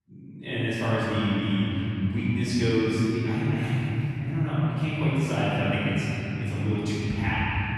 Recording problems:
room echo; strong; dies away in 3 s
off-mic speech; far

